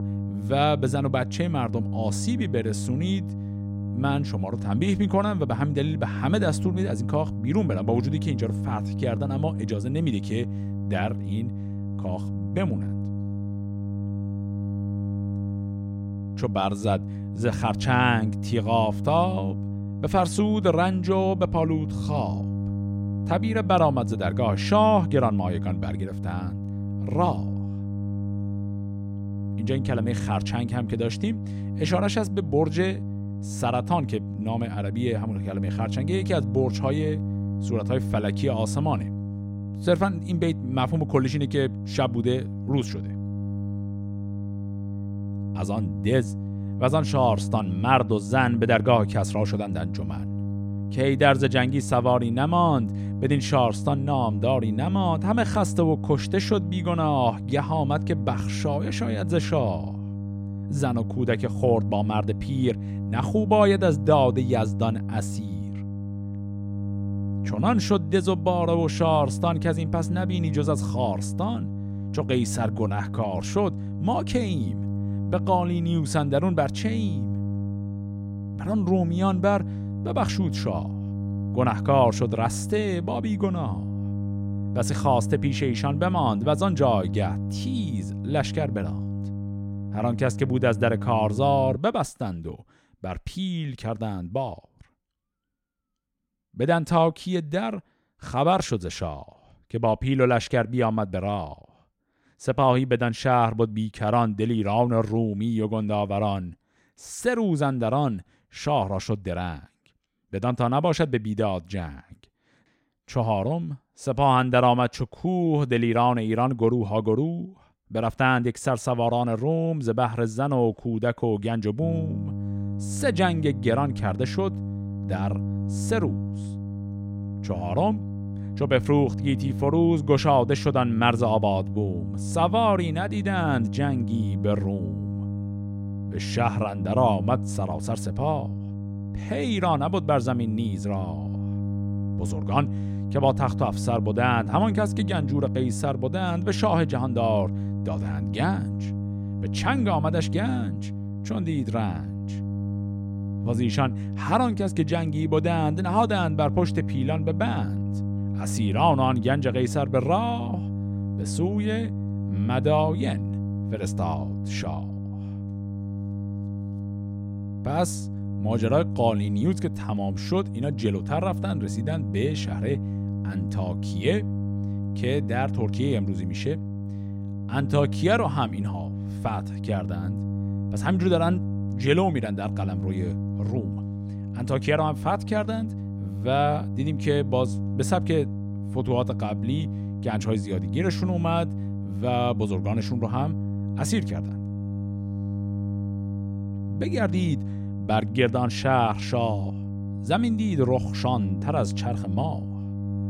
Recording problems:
electrical hum; noticeable; until 1:32 and from 2:02 on; 50 Hz, 15 dB below the speech

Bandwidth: 16 kHz